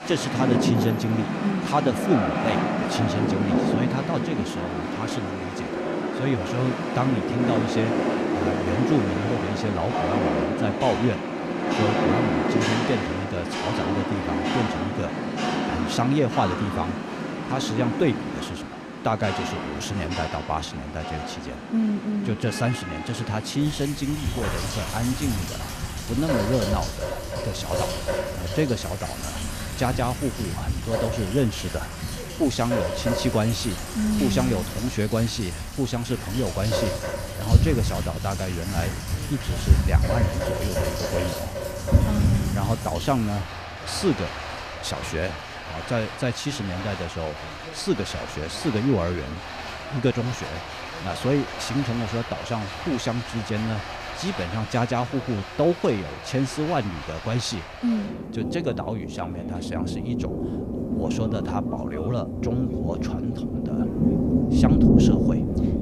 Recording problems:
rain or running water; very loud; throughout; as loud as the speech
voice in the background; faint; throughout; 20 dB below the speech

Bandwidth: 14.5 kHz